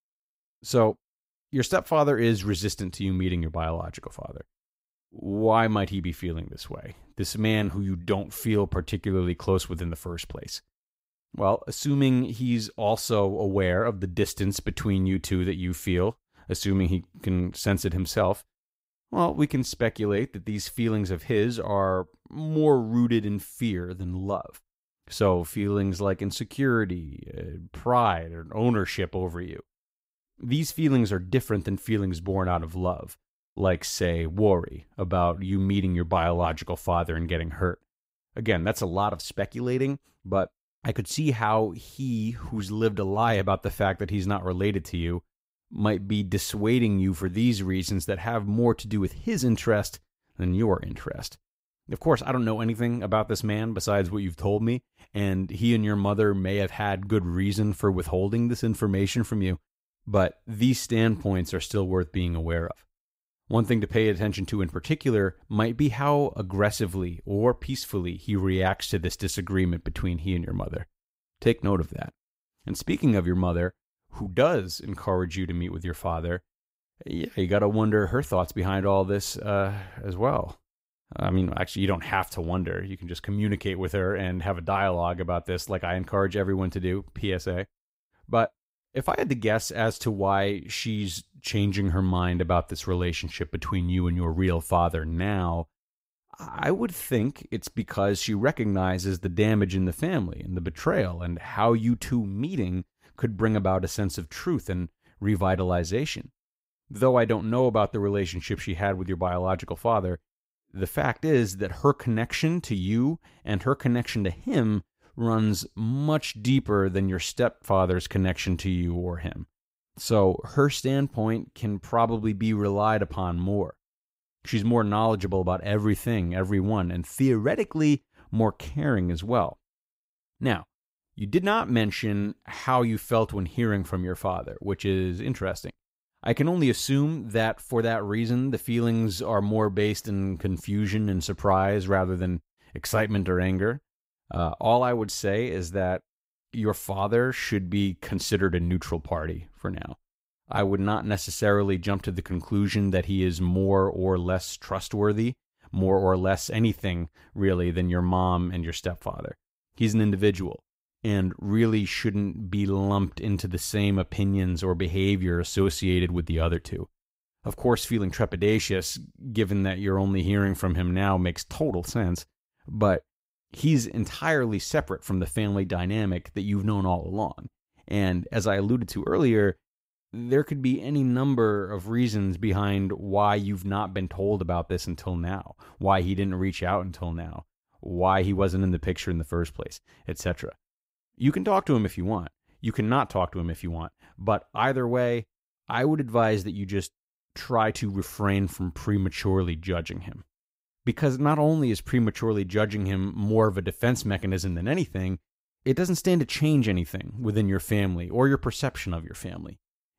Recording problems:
none

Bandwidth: 15.5 kHz